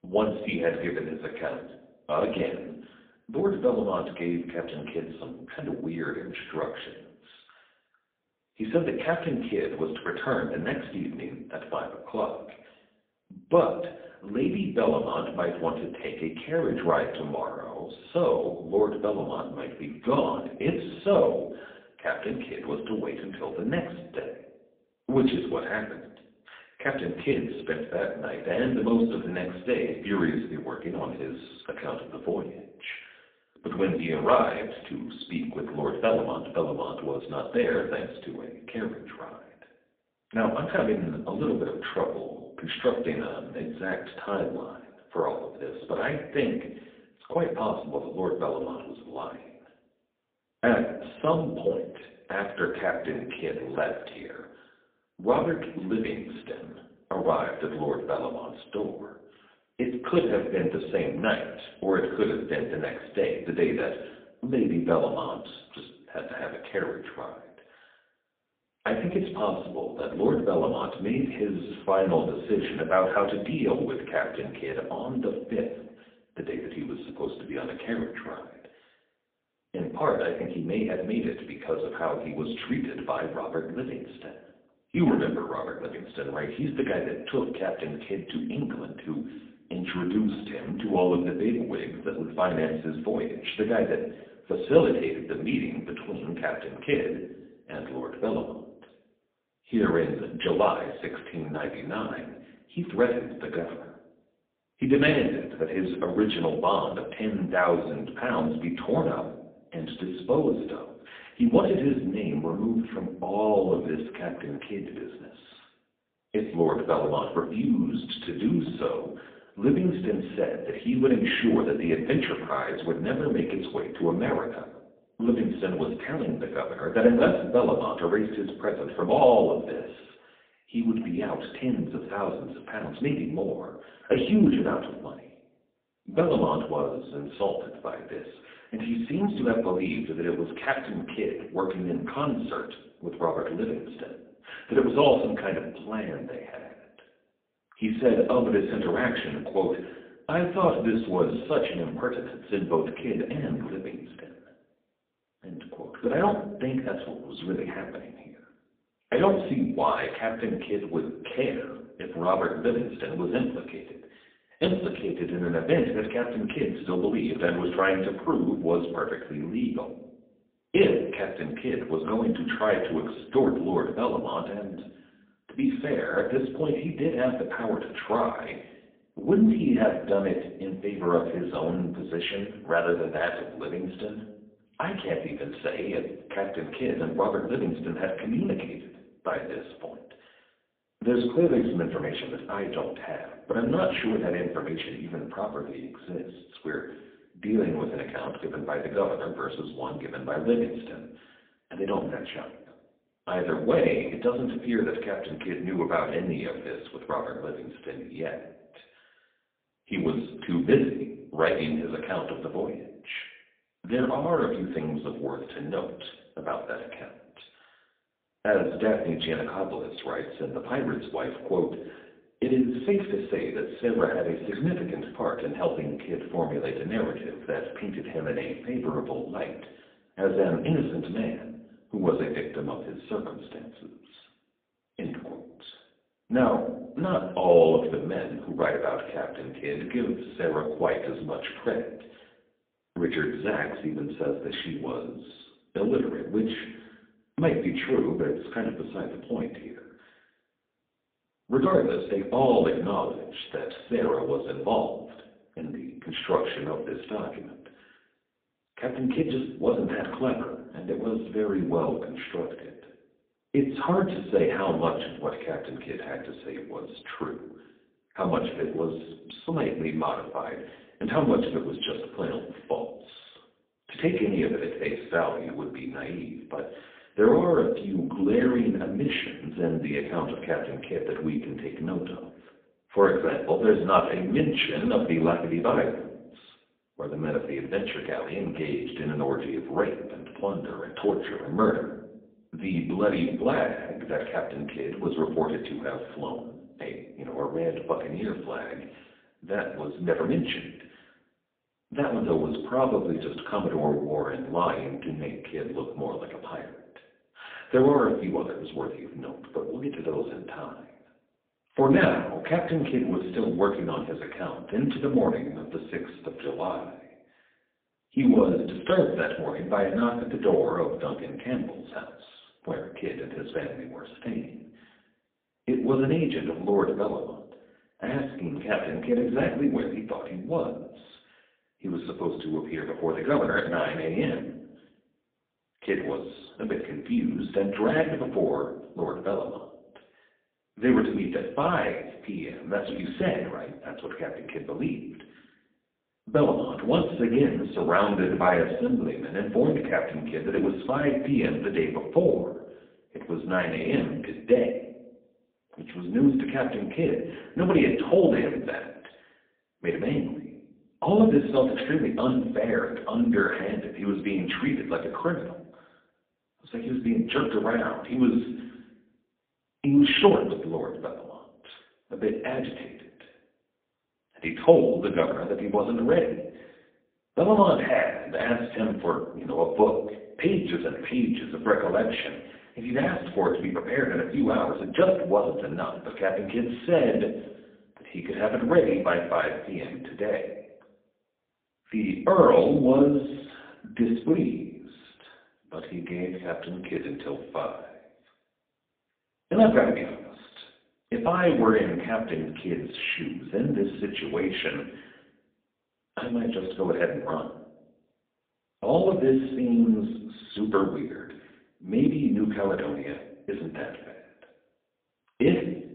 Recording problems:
phone-call audio; poor line
room echo; slight; dies away in 0.6 s
off-mic speech; somewhat distant

